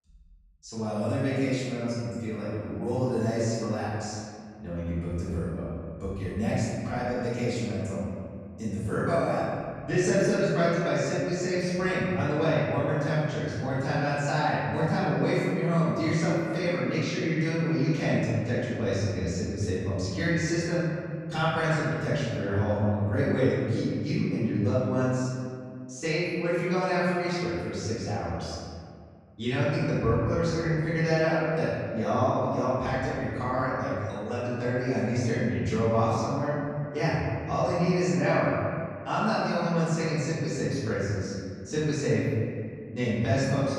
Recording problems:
room echo; strong; dies away in 2.1 s
off-mic speech; far

